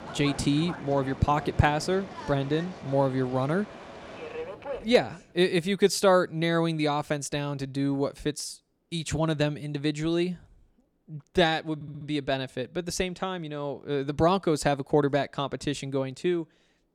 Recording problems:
train or aircraft noise; noticeable; until 5 s; 15 dB below the speech
audio stuttering; at 12 s

